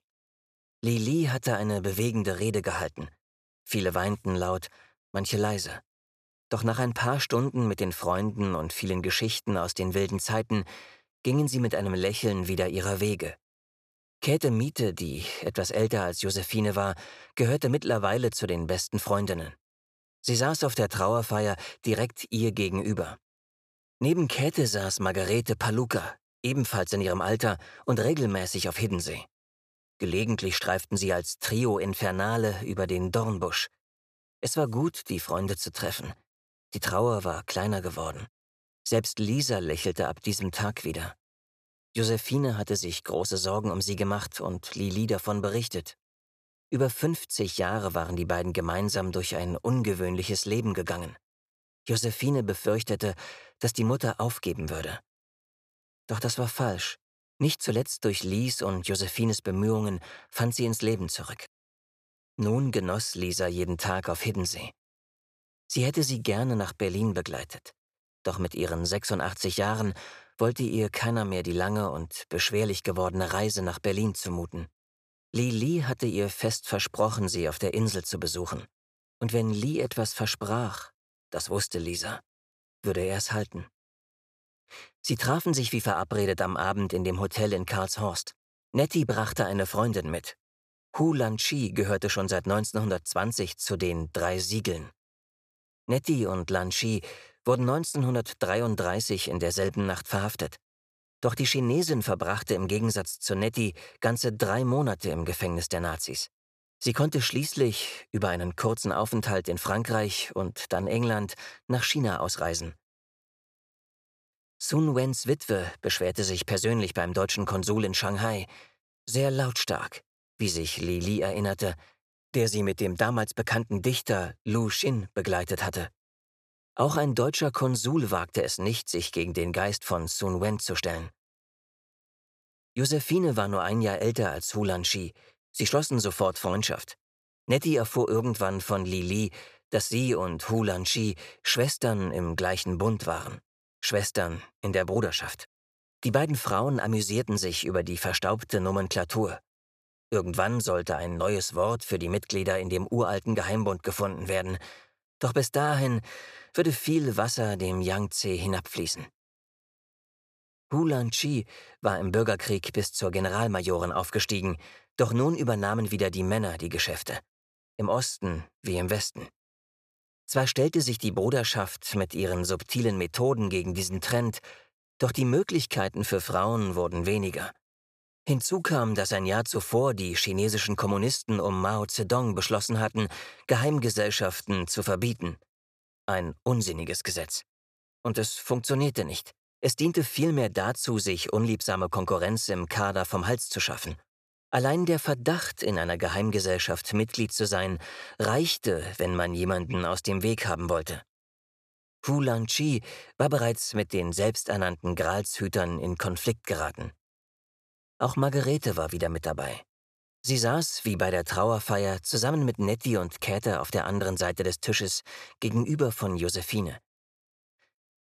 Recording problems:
none

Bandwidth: 14.5 kHz